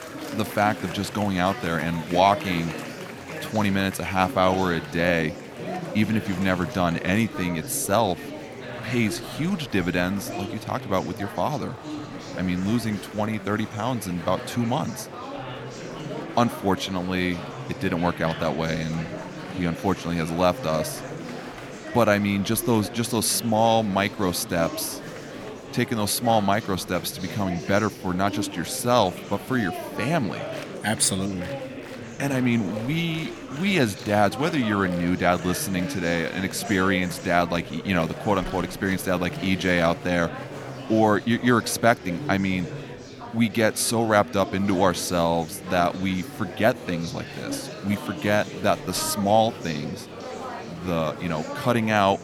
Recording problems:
murmuring crowd; noticeable; throughout; 10 dB below the speech

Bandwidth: 17.5 kHz